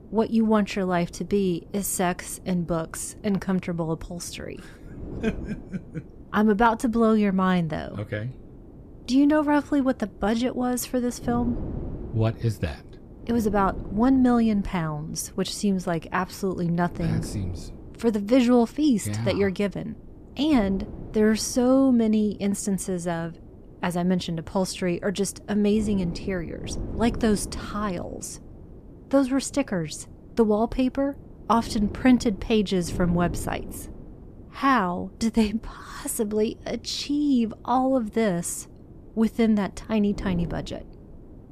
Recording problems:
wind noise on the microphone; occasional gusts; 20 dB below the speech

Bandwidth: 14.5 kHz